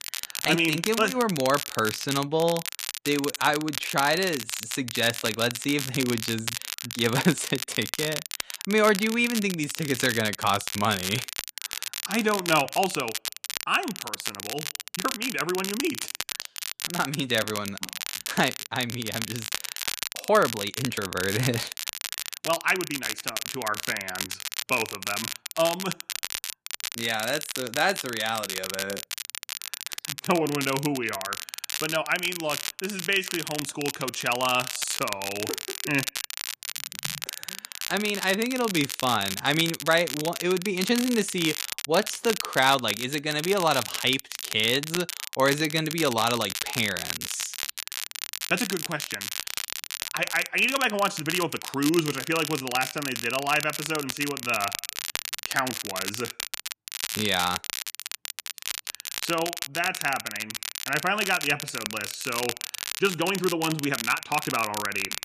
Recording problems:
crackle, like an old record; loud; 5 dB below the speech
uneven, jittery; strongly; from 7 s to 1:05

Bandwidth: 14.5 kHz